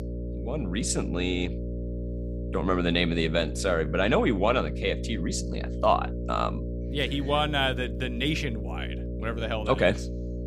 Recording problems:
electrical hum; noticeable; throughout; 60 Hz, 15 dB below the speech

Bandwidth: 15 kHz